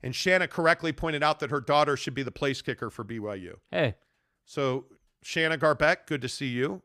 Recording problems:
none

